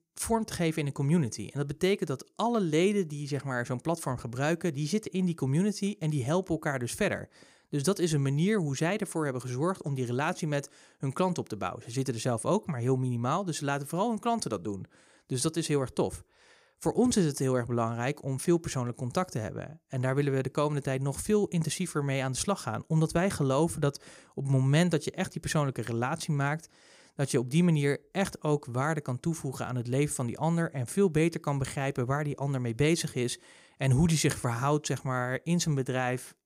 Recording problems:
none

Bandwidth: 15.5 kHz